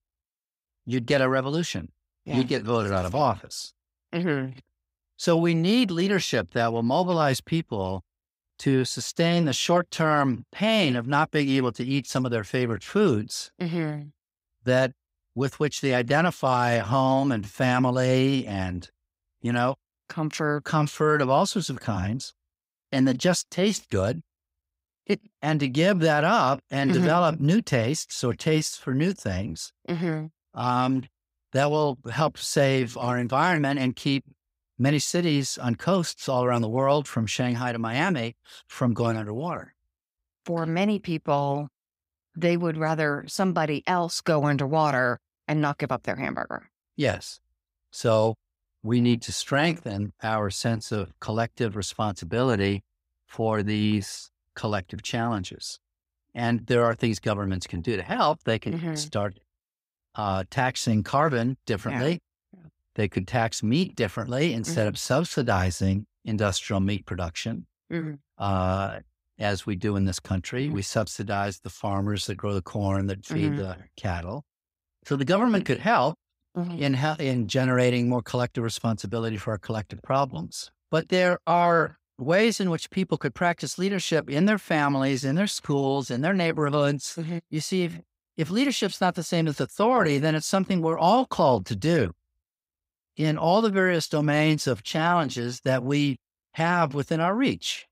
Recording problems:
none

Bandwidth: 15.5 kHz